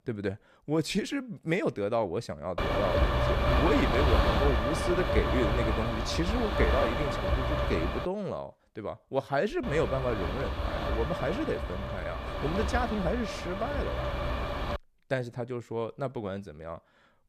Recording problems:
wind noise on the microphone; heavy; from 2.5 to 8 s and from 9.5 to 15 s; 2 dB above the speech

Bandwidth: 14.5 kHz